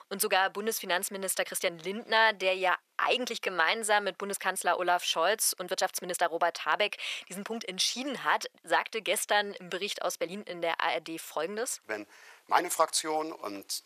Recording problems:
thin; very; fading below 650 Hz
uneven, jittery; strongly; from 1.5 to 13 s

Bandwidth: 14.5 kHz